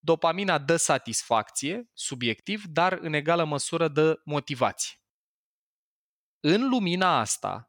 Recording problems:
none

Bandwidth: 17.5 kHz